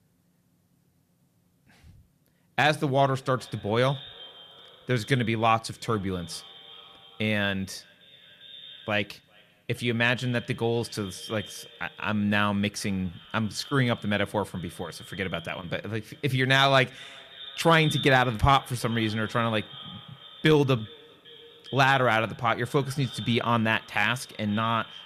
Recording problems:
echo of what is said; noticeable; throughout; 400 ms later, 15 dB below the speech

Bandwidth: 14.5 kHz